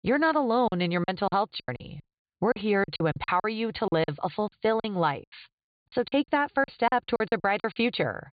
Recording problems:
high frequencies cut off; severe; nothing above 4.5 kHz
choppy; very; 15% of the speech affected

